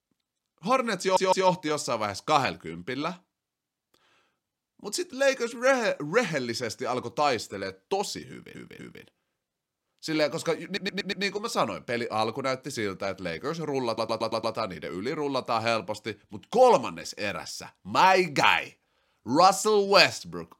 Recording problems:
audio stuttering; 4 times, first at 1 s

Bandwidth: 16 kHz